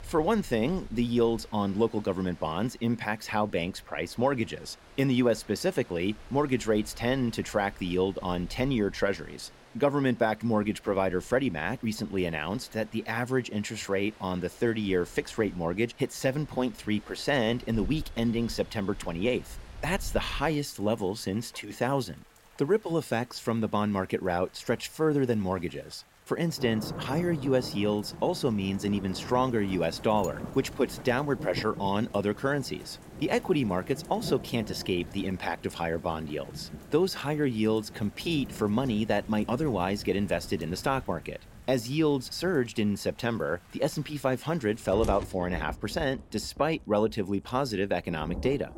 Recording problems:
rain or running water; noticeable; throughout; 15 dB below the speech

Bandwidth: 16 kHz